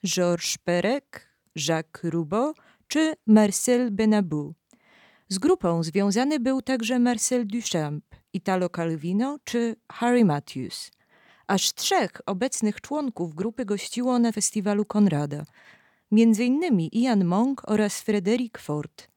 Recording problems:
none

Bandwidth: 18.5 kHz